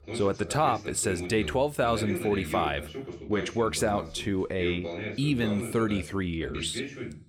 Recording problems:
voice in the background; loud; throughout; 8 dB below the speech

